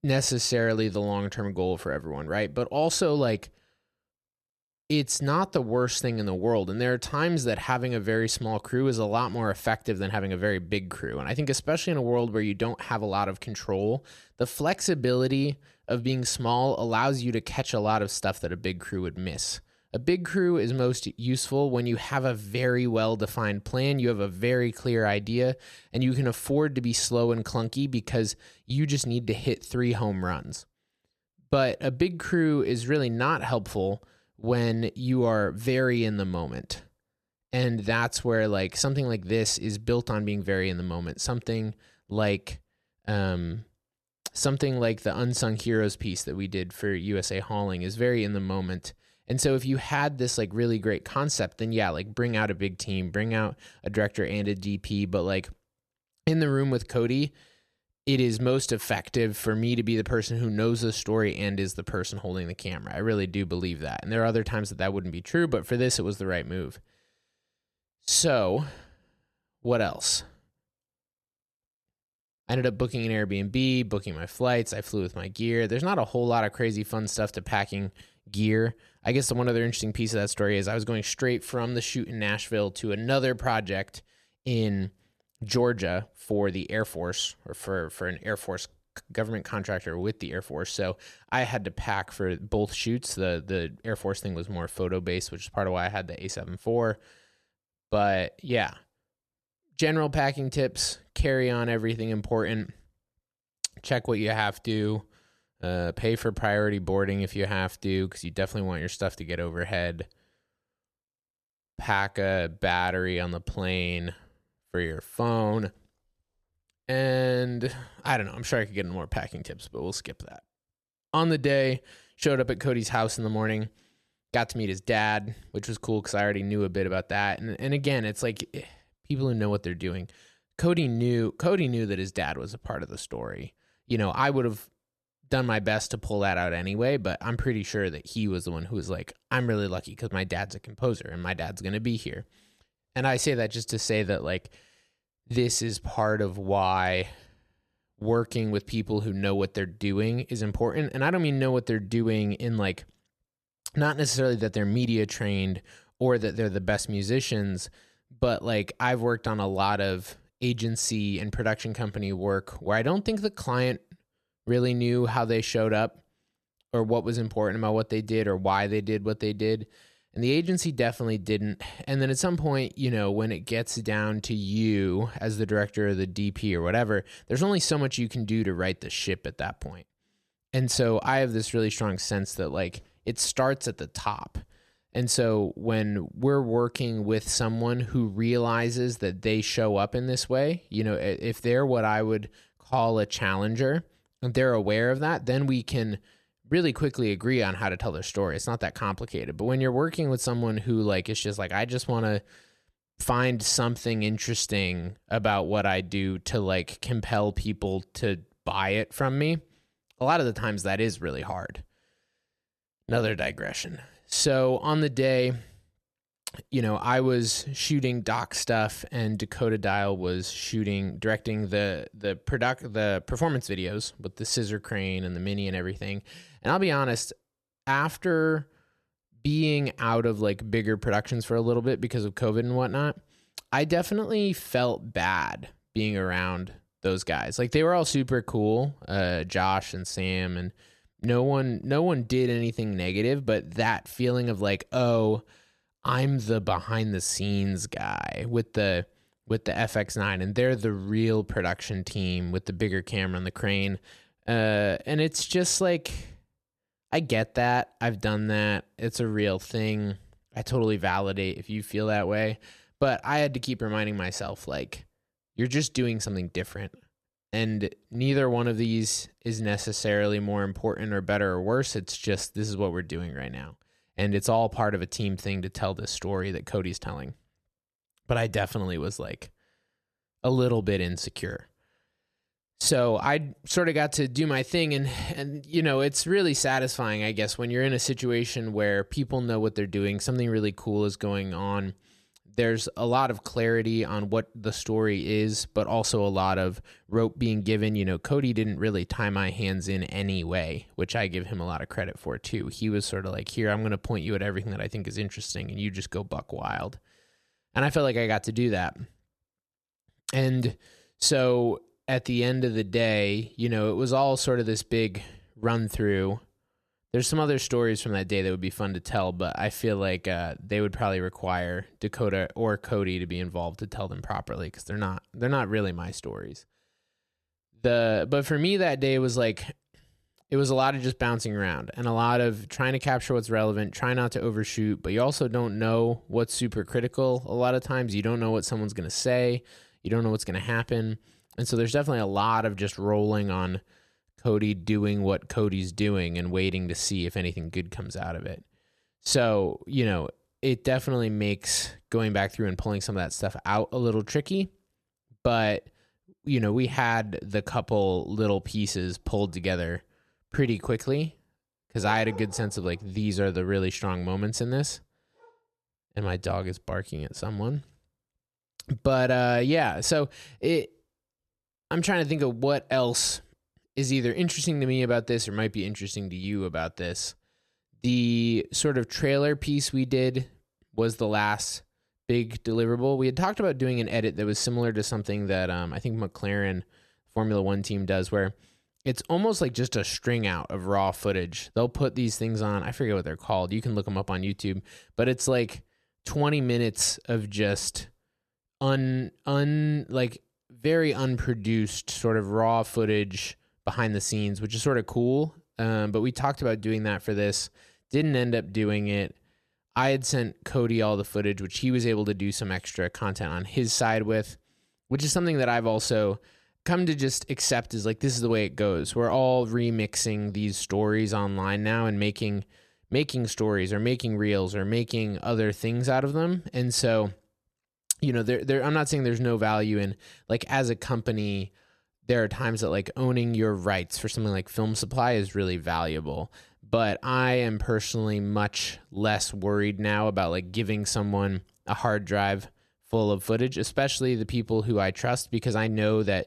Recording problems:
none

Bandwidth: 14 kHz